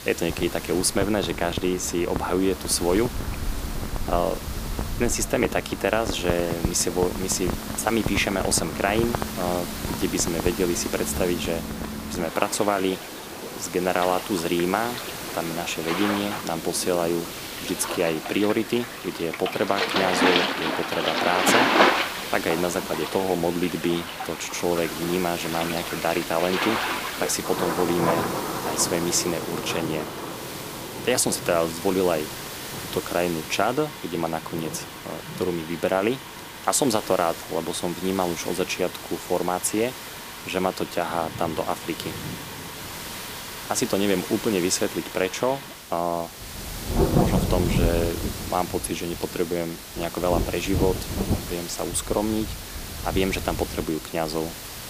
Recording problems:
rain or running water; loud; throughout; 4 dB below the speech
hiss; noticeable; throughout; 10 dB below the speech

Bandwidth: 15 kHz